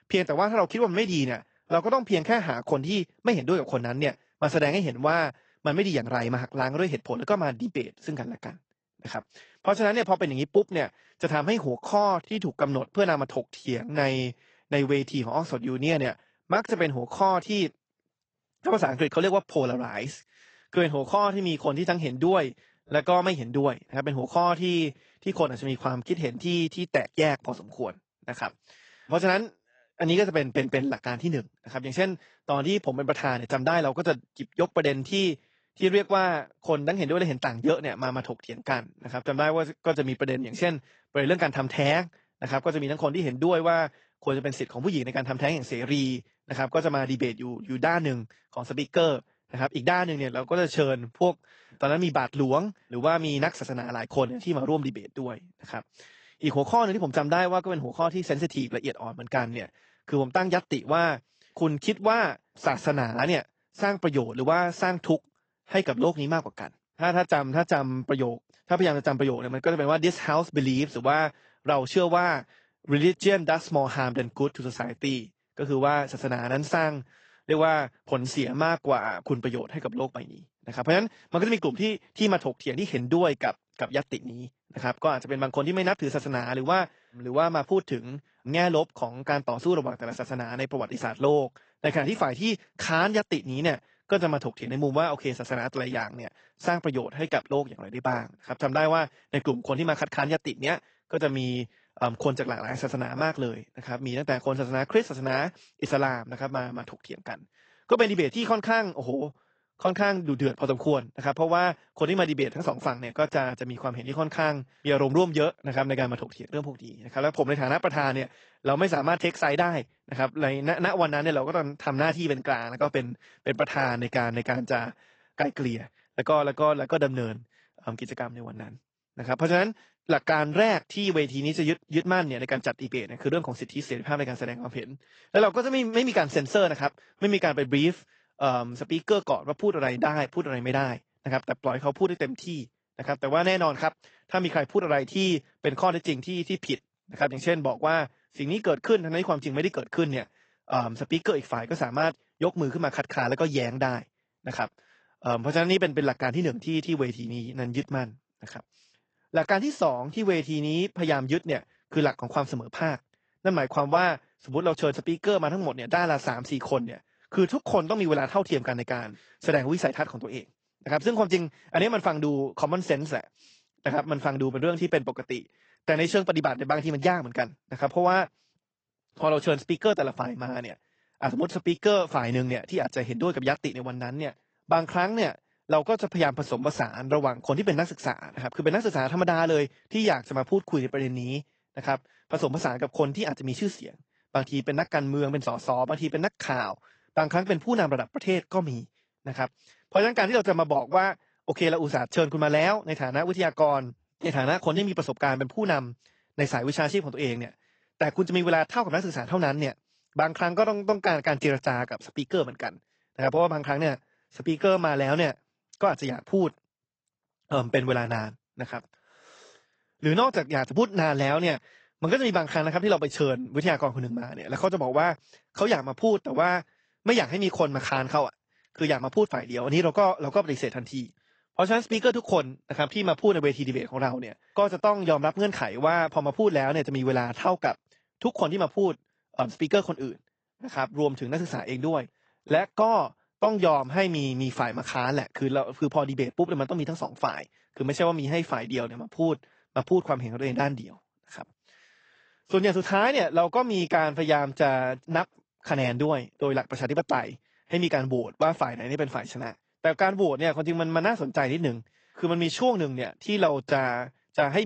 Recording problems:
high frequencies cut off; noticeable; nothing above 8 kHz
garbled, watery; slightly
abrupt cut into speech; at the end

